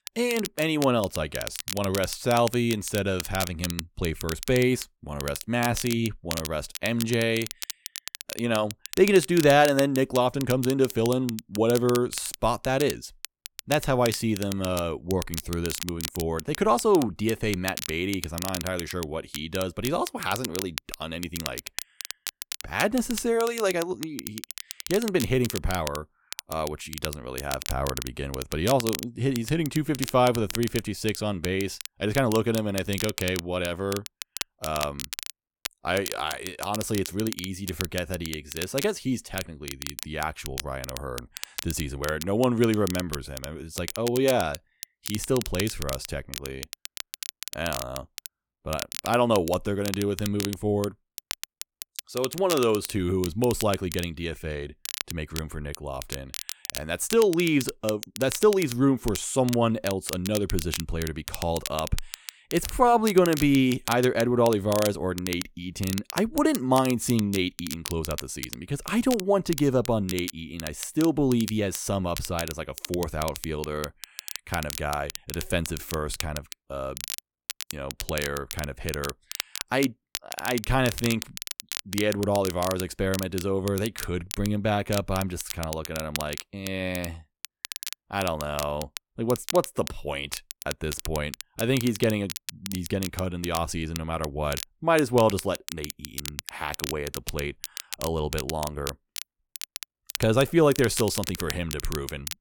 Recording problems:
crackle, like an old record; loud; 9 dB below the speech

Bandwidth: 17.5 kHz